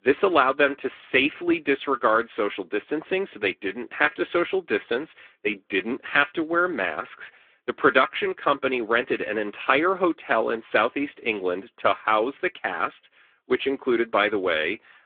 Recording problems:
phone-call audio

